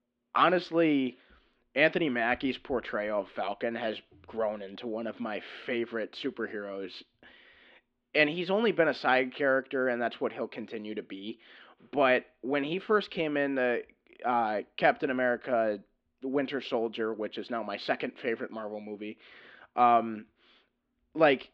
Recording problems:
muffled; slightly; fading above 3.5 kHz

